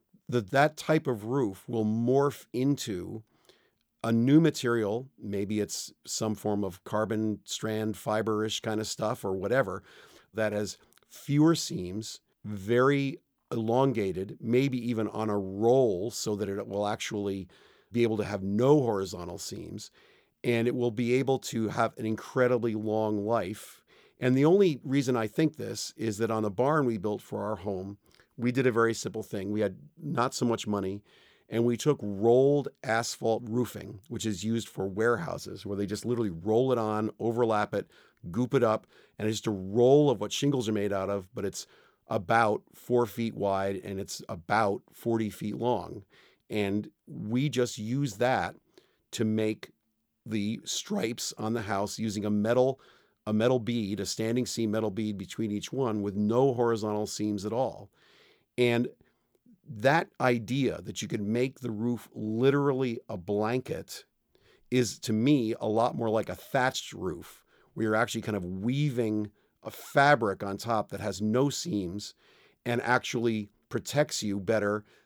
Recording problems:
none

